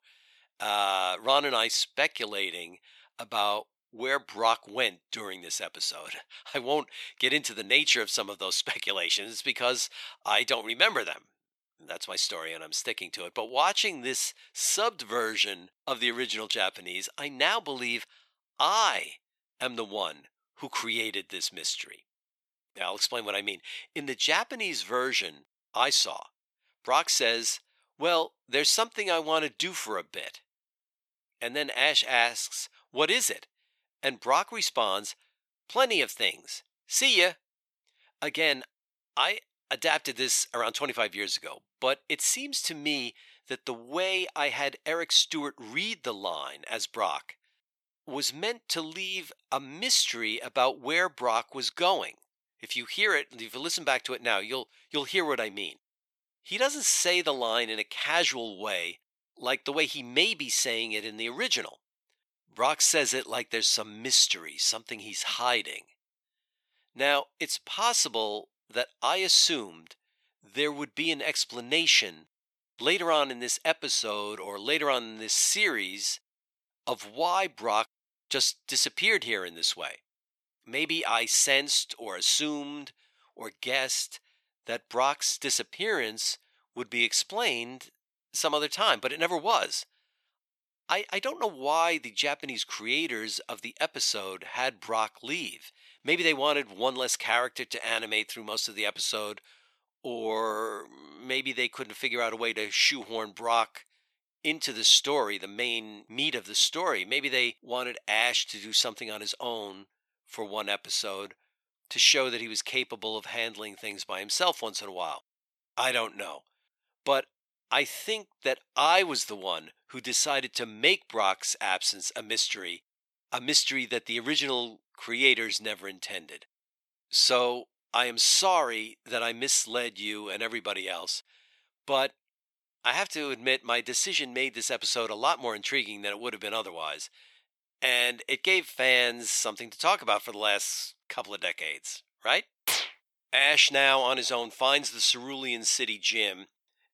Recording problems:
thin; very; fading below 600 Hz

